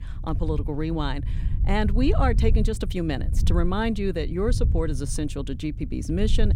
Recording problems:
low rumble; noticeable; throughout; 15 dB below the speech

